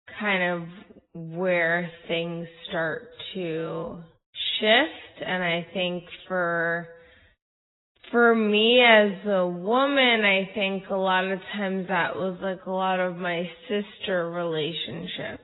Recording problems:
garbled, watery; badly; nothing above 4 kHz
wrong speed, natural pitch; too slow; 0.5 times normal speed

